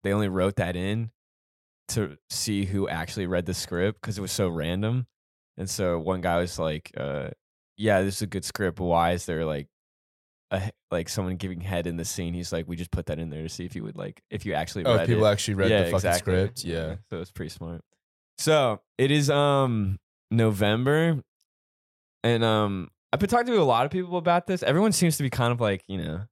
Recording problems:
none

